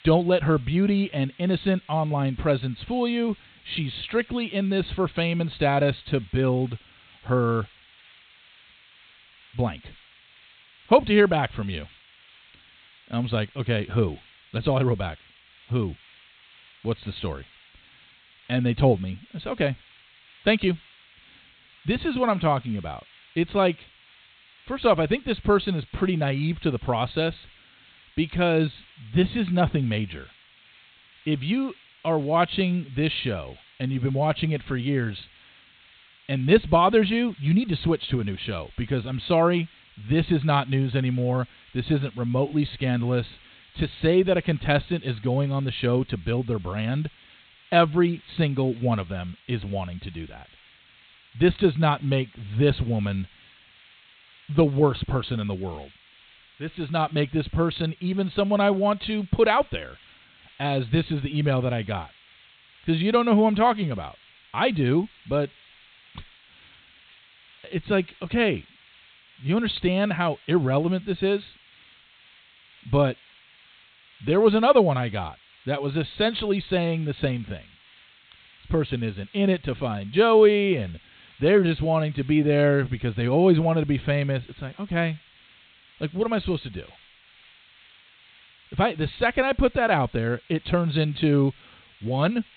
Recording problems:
high frequencies cut off; severe; nothing above 4 kHz
hiss; faint; throughout; 25 dB below the speech

